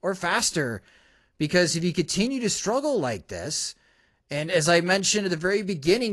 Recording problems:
garbled, watery; slightly; nothing above 11 kHz
abrupt cut into speech; at the end

